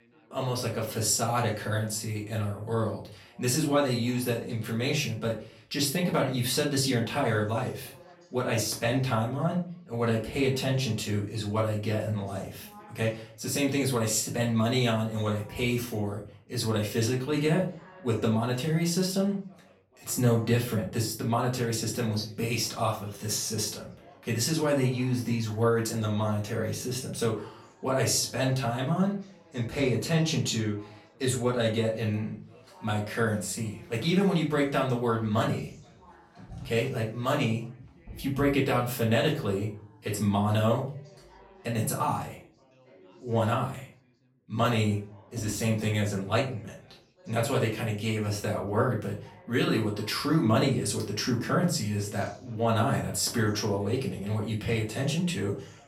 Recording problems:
off-mic speech; far
room echo; slight; dies away in 0.3 s
background chatter; faint; throughout; 3 voices, 25 dB below the speech

